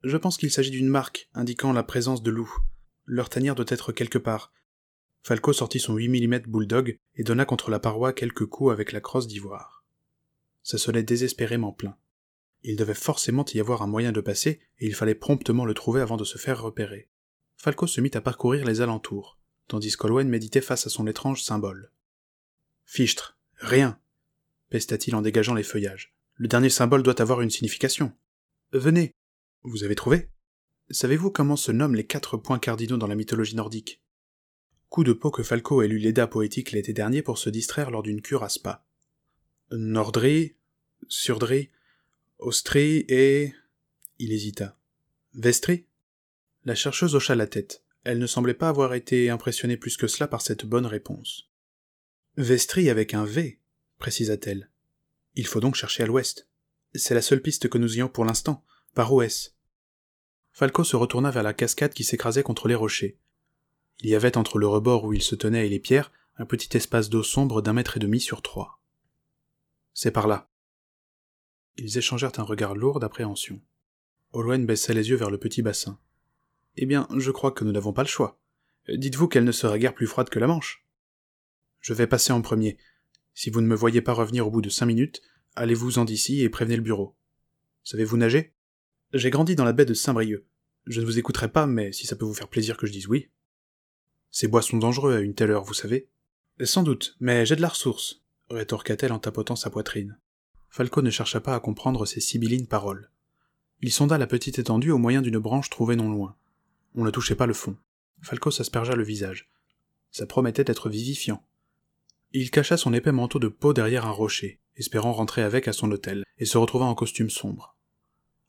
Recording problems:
none

